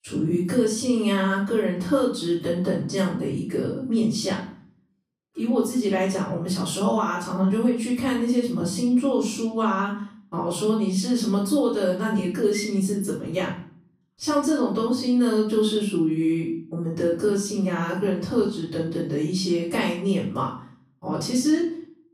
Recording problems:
off-mic speech; far
room echo; noticeable; dies away in 0.5 s

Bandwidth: 15 kHz